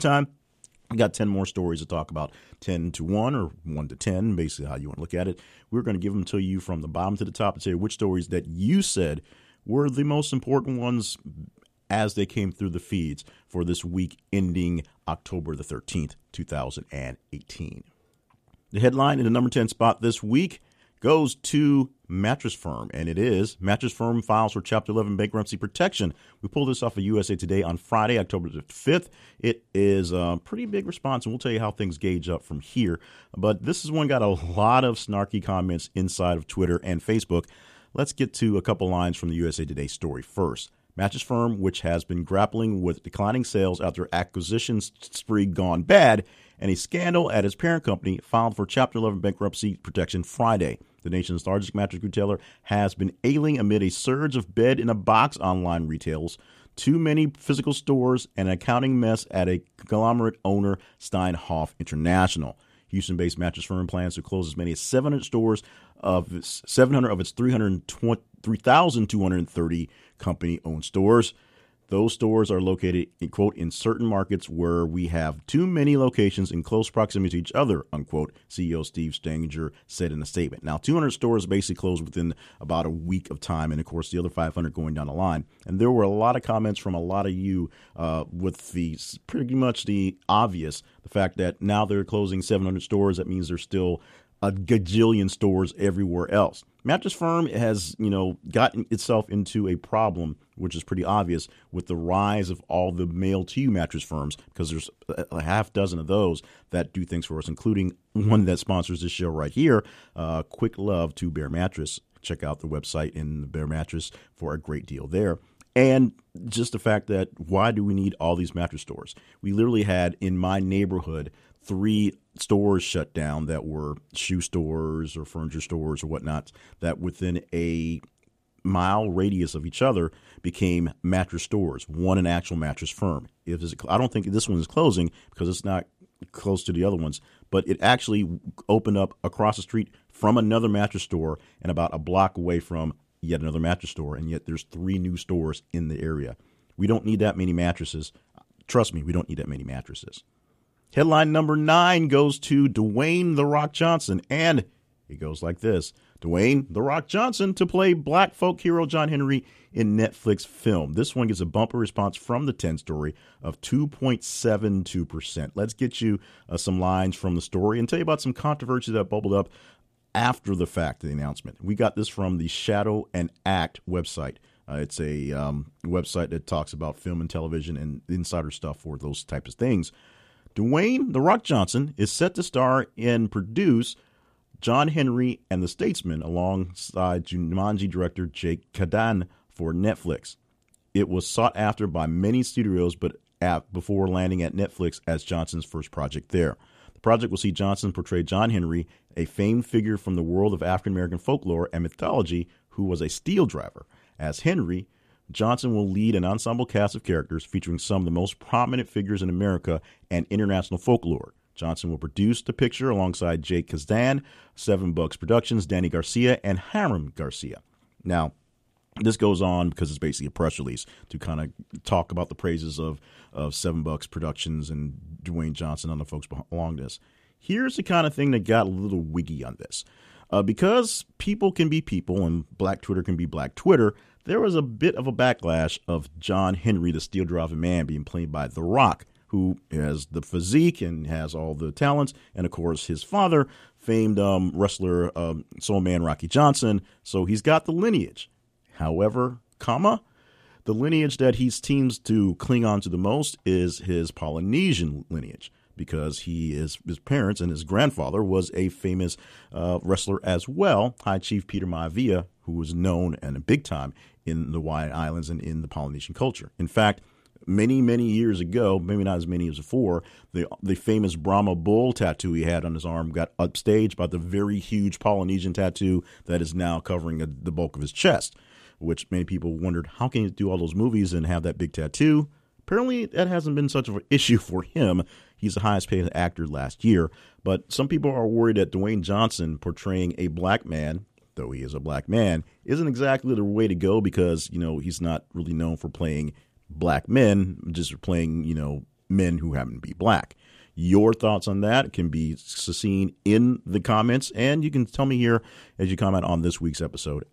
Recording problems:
abrupt cut into speech; at the start

